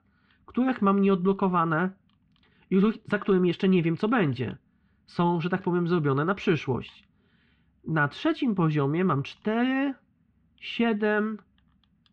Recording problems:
muffled; very; fading above 3 kHz

